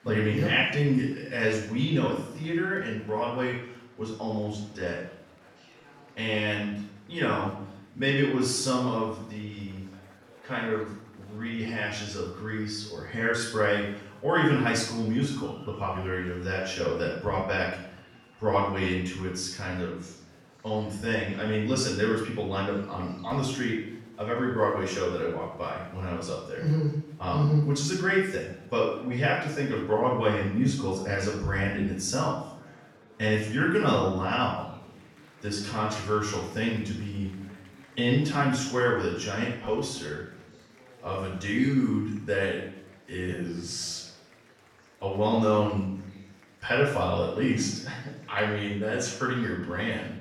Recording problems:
off-mic speech; far
room echo; noticeable; dies away in 0.6 s
murmuring crowd; faint; throughout; 25 dB below the speech

